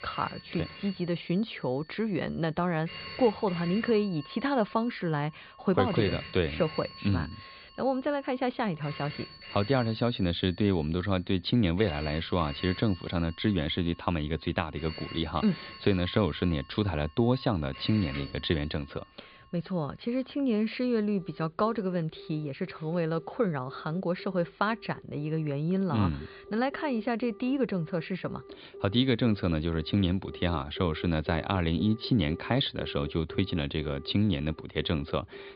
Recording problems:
high frequencies cut off; severe; nothing above 4.5 kHz
alarms or sirens; noticeable; throughout; 15 dB below the speech

